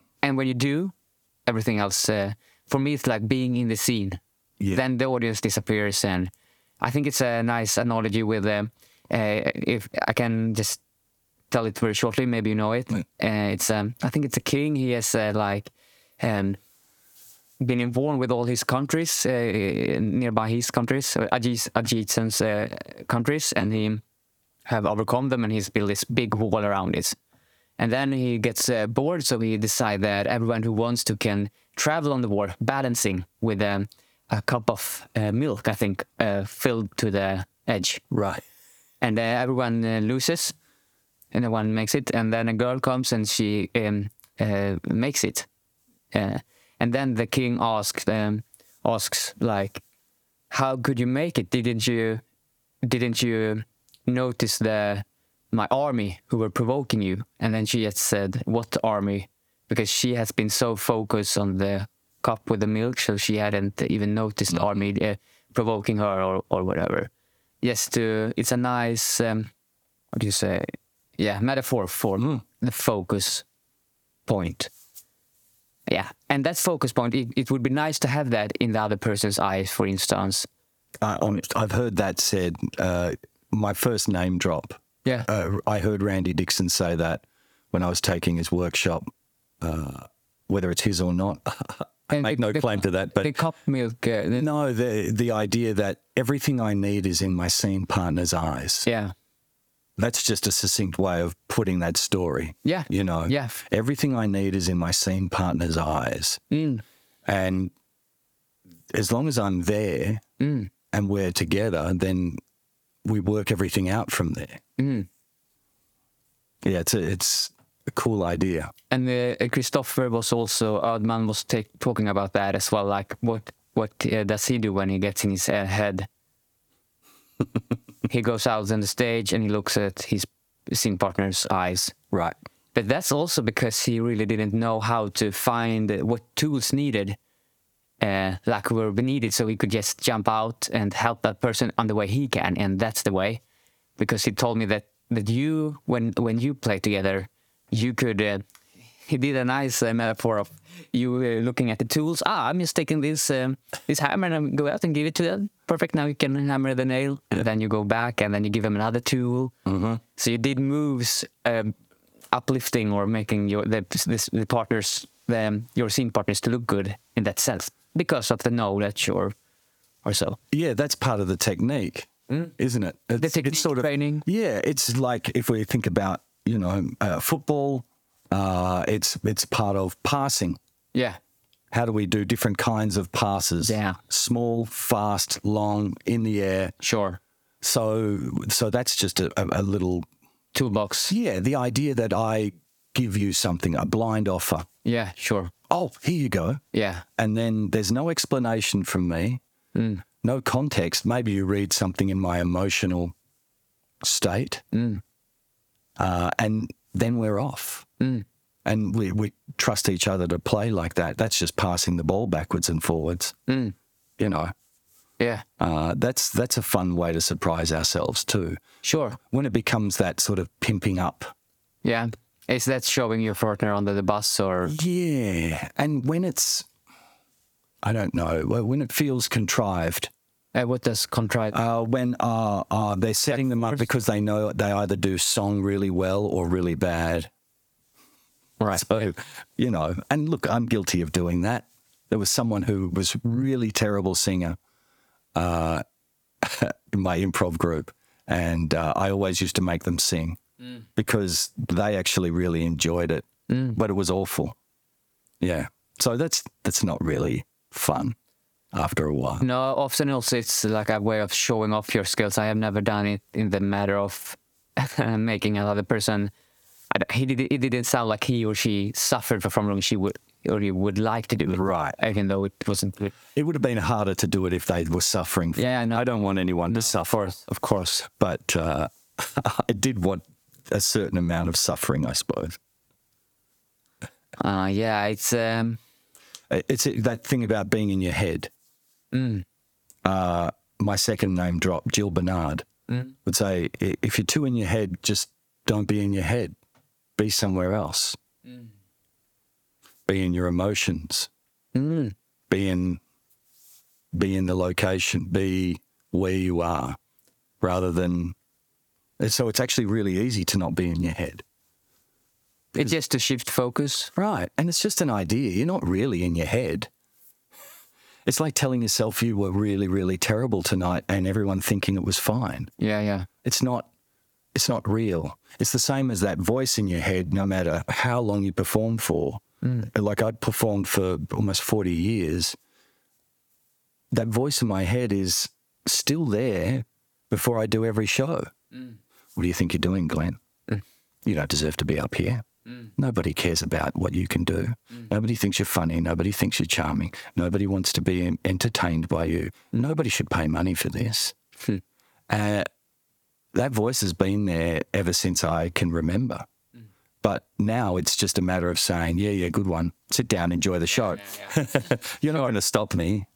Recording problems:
squashed, flat; somewhat

